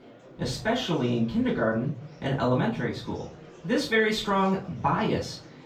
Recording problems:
off-mic speech; far
room echo; slight; dies away in 0.4 s
murmuring crowd; faint; throughout; 20 dB below the speech

